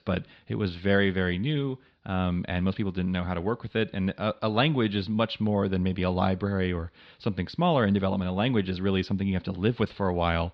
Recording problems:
muffled; very slightly; fading above 4 kHz

